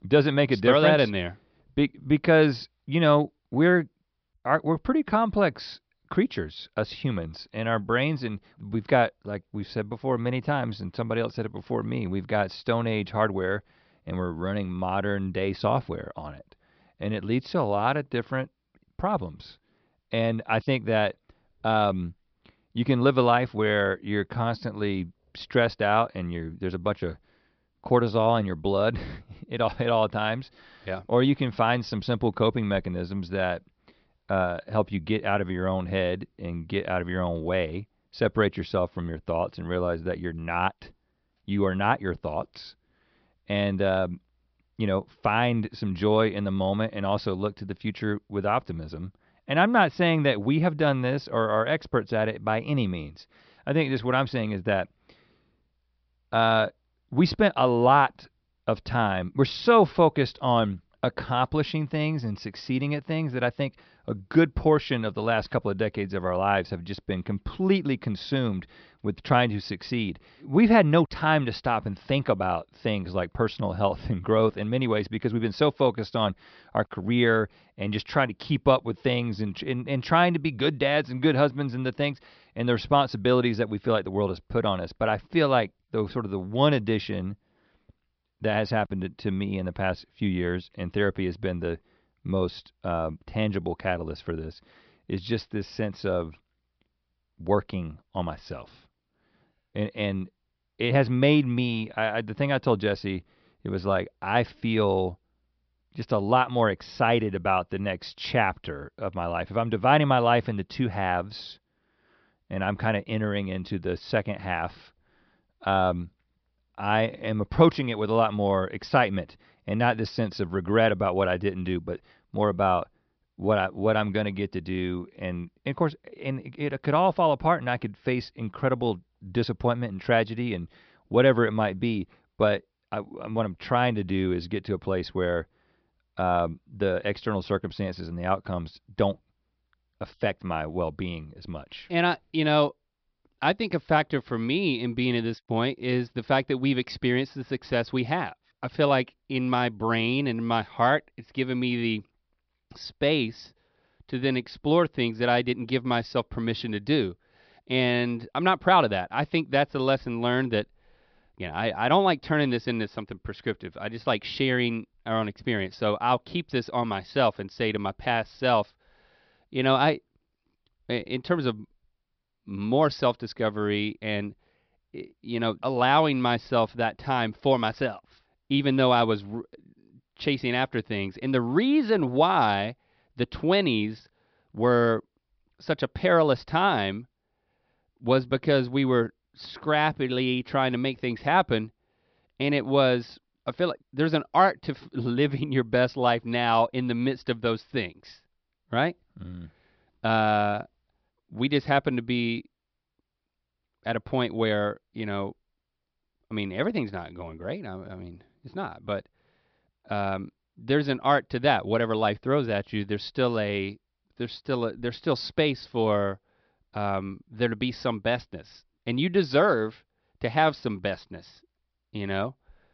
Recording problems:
high frequencies cut off; noticeable; nothing above 5.5 kHz

